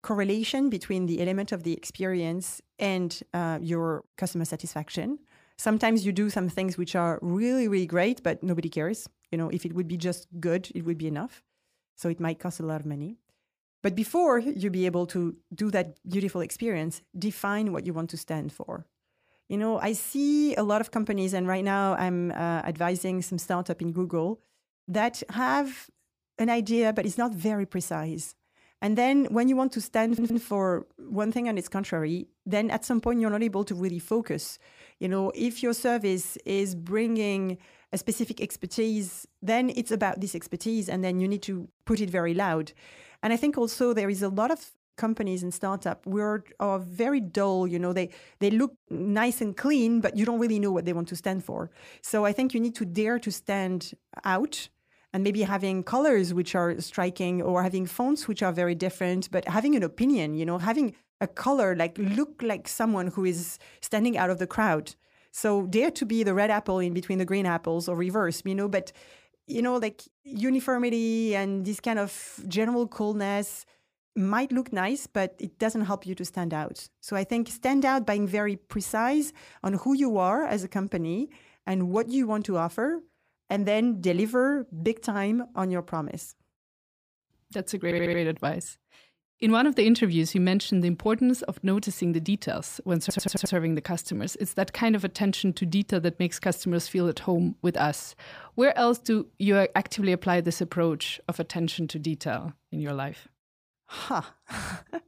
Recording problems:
audio stuttering; at 30 s, at 1:28 and at 1:33

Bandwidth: 15 kHz